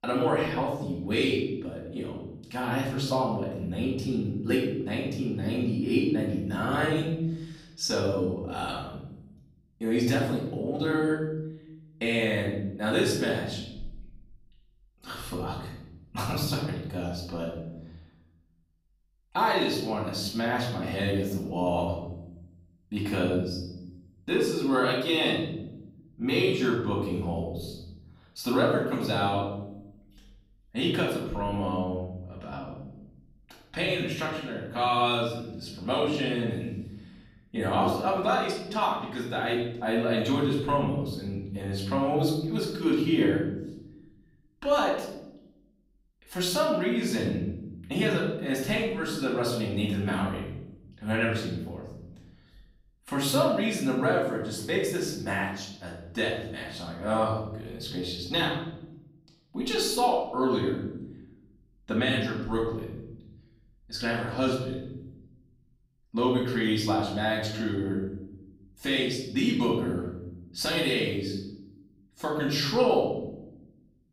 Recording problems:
off-mic speech; far
room echo; noticeable; dies away in 1.1 s

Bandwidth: 15.5 kHz